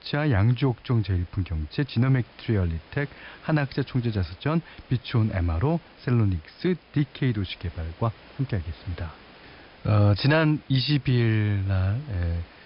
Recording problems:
high frequencies cut off; noticeable; nothing above 5 kHz
hiss; faint; throughout; 25 dB below the speech

